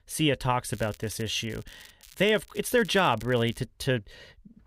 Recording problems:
crackling; faint; from 0.5 to 2 s, at 2 s and at 2.5 s; 25 dB below the speech

